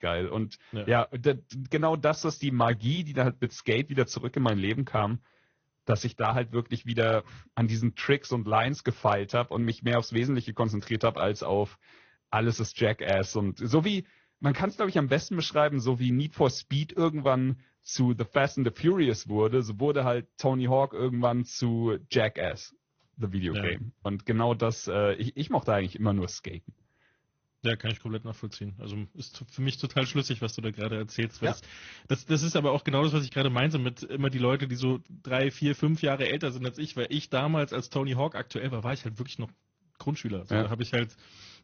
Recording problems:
garbled, watery; slightly; nothing above 6.5 kHz

